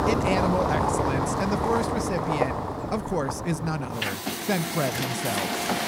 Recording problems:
traffic noise; very loud; throughout; 2 dB above the speech

